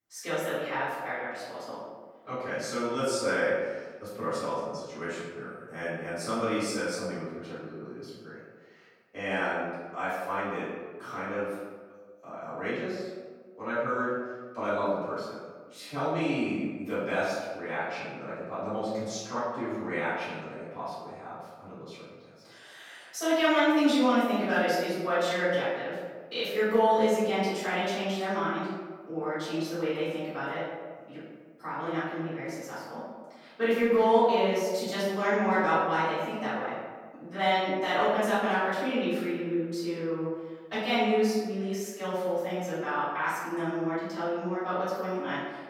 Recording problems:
room echo; strong; dies away in 1.2 s
off-mic speech; far

